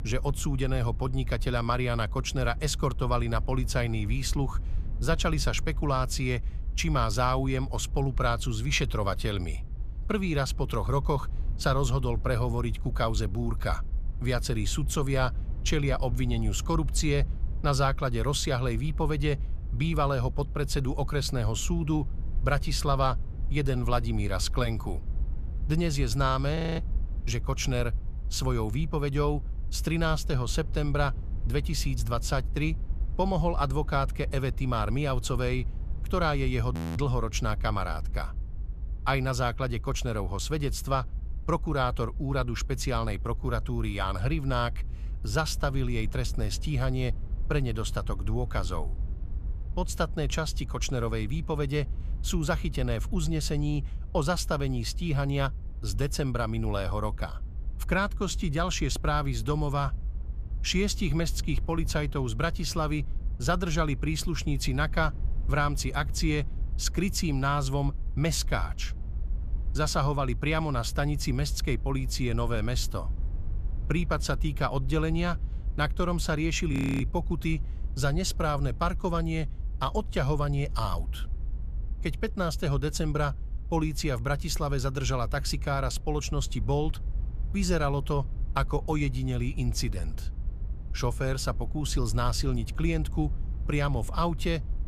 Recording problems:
low rumble; faint; throughout; 20 dB below the speech
audio freezing; at 27 s, at 37 s and at 1:17

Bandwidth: 14.5 kHz